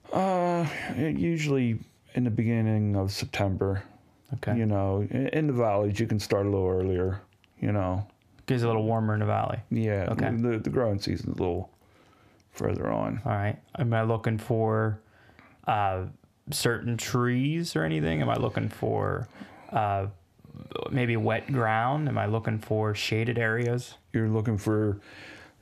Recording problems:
squashed, flat; heavily

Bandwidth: 14.5 kHz